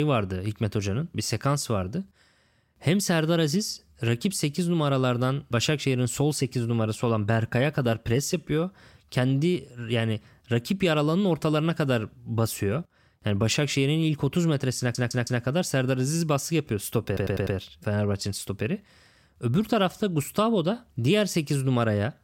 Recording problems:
abrupt cut into speech; at the start
audio stuttering; at 15 s and at 17 s

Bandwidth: 16 kHz